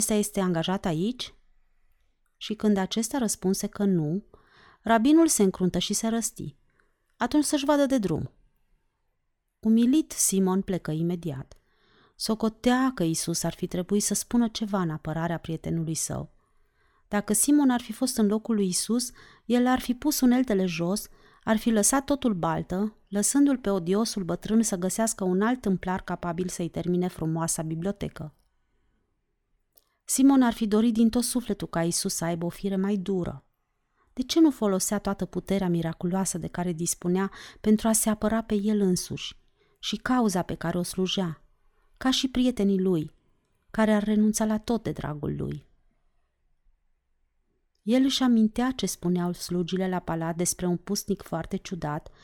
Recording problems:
abrupt cut into speech; at the start

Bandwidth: 18 kHz